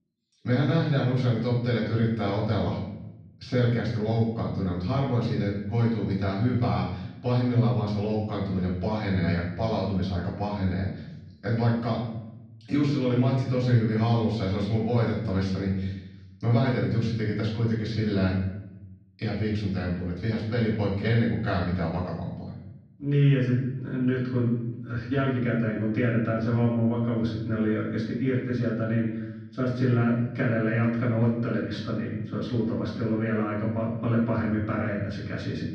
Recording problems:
off-mic speech; far
room echo; noticeable; dies away in 0.9 s
muffled; slightly; fading above 4 kHz

